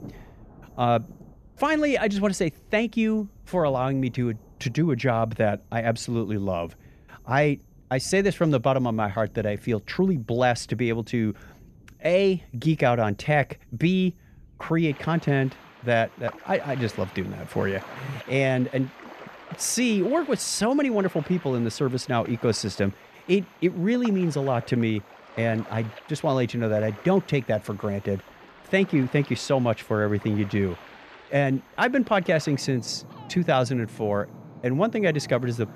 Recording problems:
rain or running water; faint; throughout; 20 dB below the speech

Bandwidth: 14.5 kHz